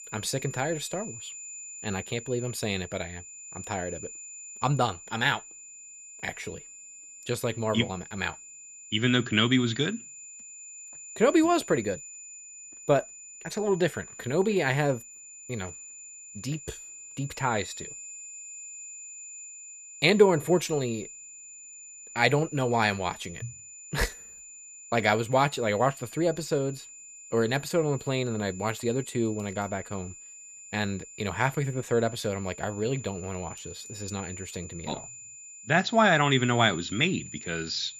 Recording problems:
high-pitched whine; noticeable; throughout; 7 kHz, 15 dB below the speech

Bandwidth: 14.5 kHz